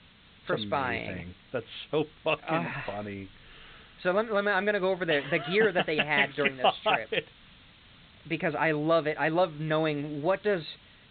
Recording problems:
high frequencies cut off; severe; nothing above 4 kHz
hiss; faint; throughout; 25 dB below the speech

